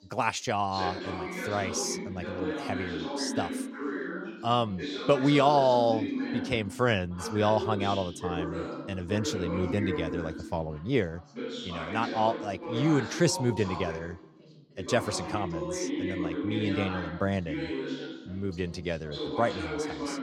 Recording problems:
background chatter; loud; throughout; 3 voices, 5 dB below the speech

